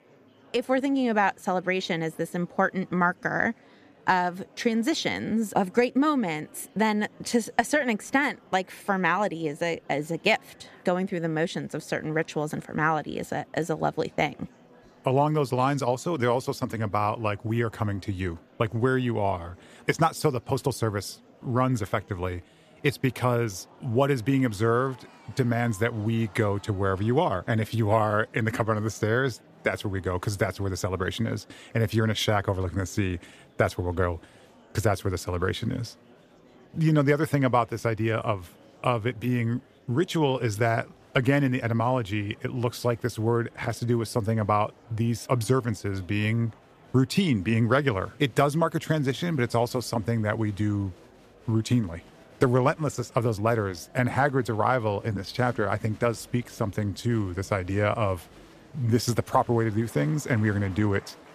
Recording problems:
murmuring crowd; faint; throughout; 25 dB below the speech

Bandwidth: 14.5 kHz